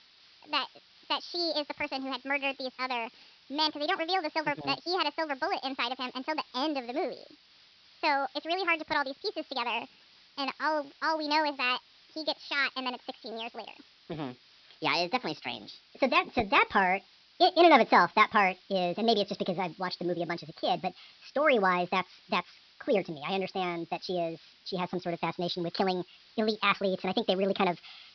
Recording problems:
wrong speed and pitch; too fast and too high; 1.5 times normal speed
high frequencies cut off; noticeable; nothing above 5.5 kHz
hiss; faint; throughout; 25 dB below the speech

